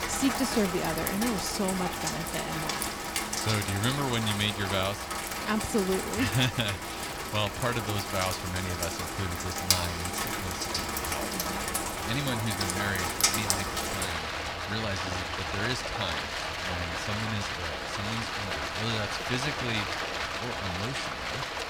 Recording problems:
rain or running water; very loud; throughout; 1 dB above the speech

